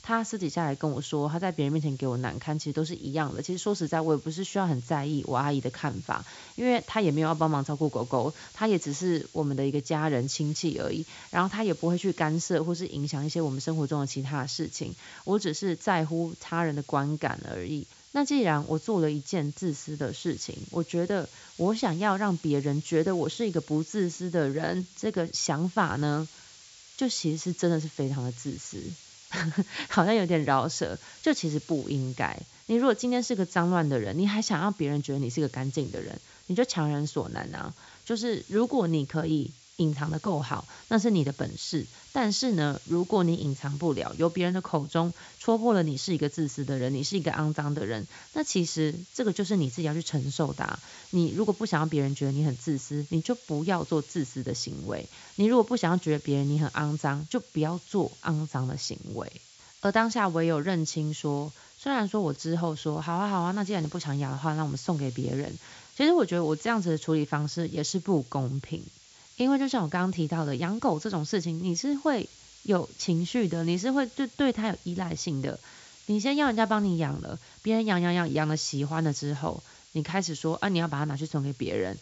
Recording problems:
high frequencies cut off; noticeable; nothing above 8 kHz
hiss; faint; throughout; 20 dB below the speech

